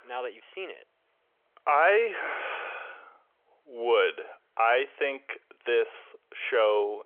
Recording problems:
phone-call audio; nothing above 3.5 kHz

